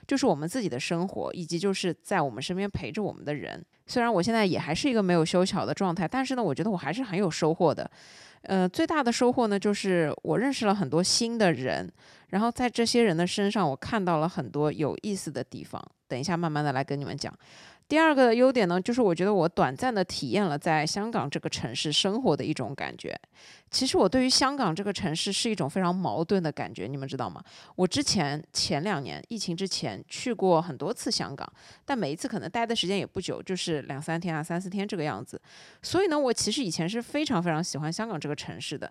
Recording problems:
none

